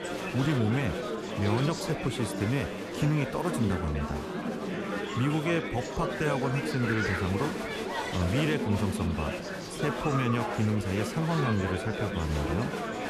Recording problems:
murmuring crowd; loud; throughout; 2 dB below the speech

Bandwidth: 14 kHz